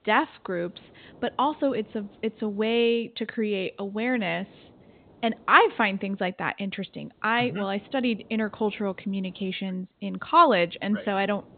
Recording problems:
high frequencies cut off; severe; nothing above 4 kHz
hiss; faint; throughout; 30 dB below the speech

